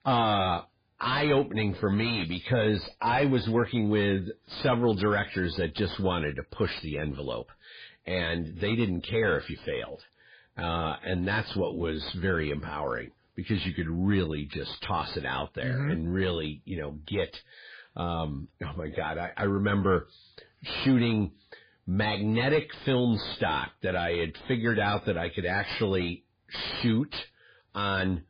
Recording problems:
distortion; heavy; 7 dB below the speech
garbled, watery; badly; nothing above 4.5 kHz

